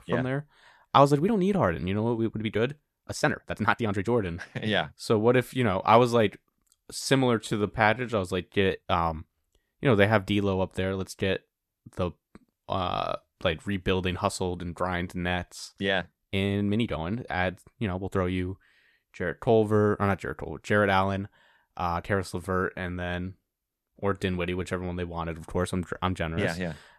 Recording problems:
uneven, jittery; strongly; from 1 to 25 s

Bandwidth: 13.5 kHz